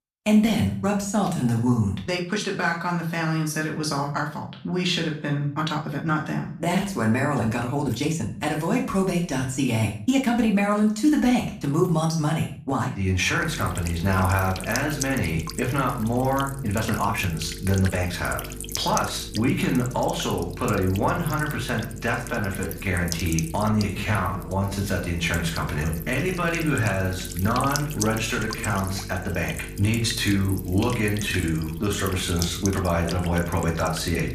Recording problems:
off-mic speech; far
room echo; slight; dies away in 0.4 s
electrical hum; noticeable; from 13 s on; 50 Hz, 10 dB below the speech
uneven, jittery; strongly; from 1.5 to 33 s

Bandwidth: 14.5 kHz